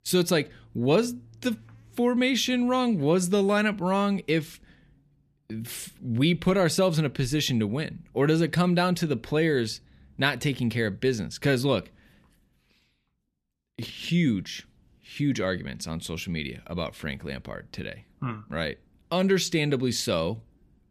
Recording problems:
none

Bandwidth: 14.5 kHz